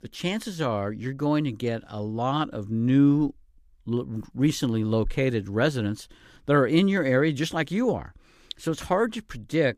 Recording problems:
none

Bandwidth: 15 kHz